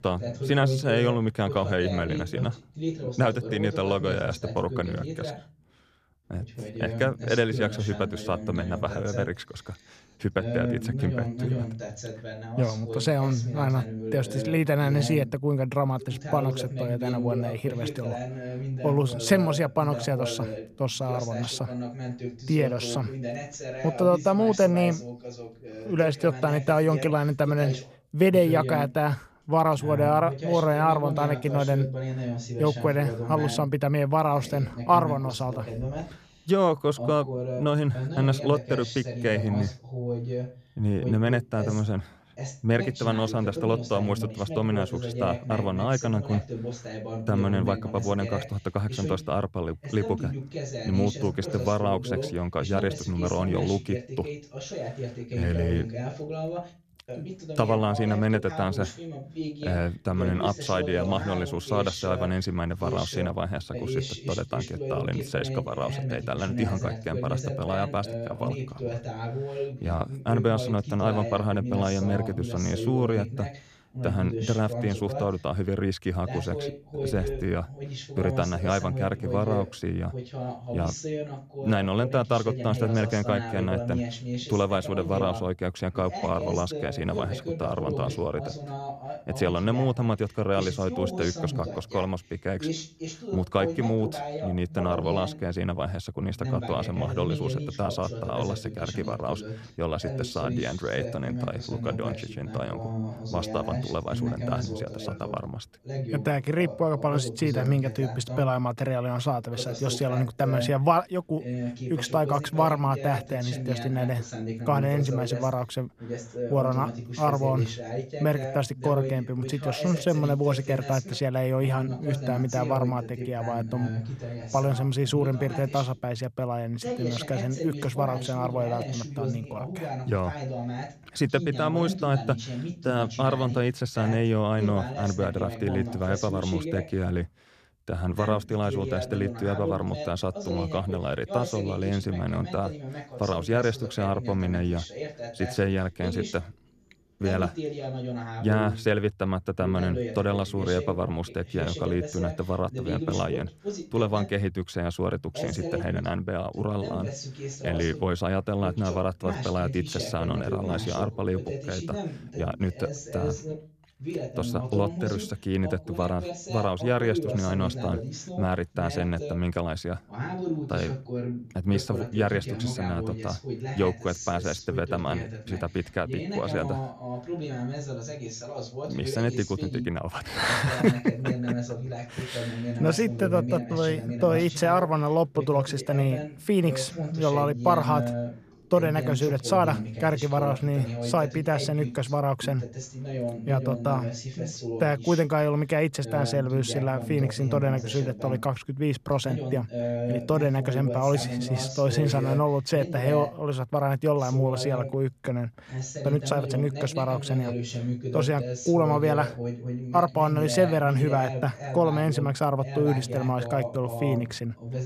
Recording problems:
voice in the background; loud; throughout; 7 dB below the speech

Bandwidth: 14.5 kHz